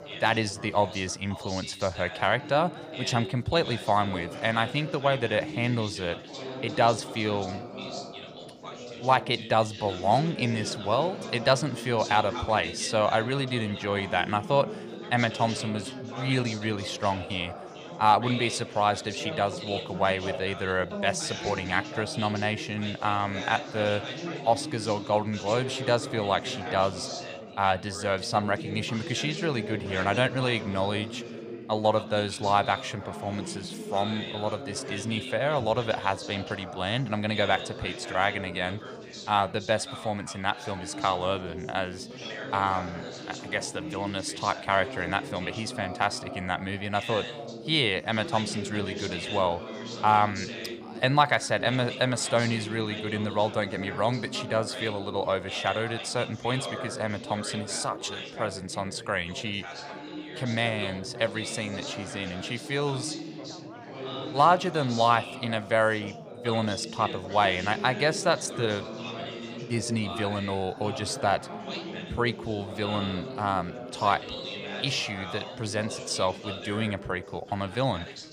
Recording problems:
background chatter; loud; throughout; 4 voices, 9 dB below the speech

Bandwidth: 15 kHz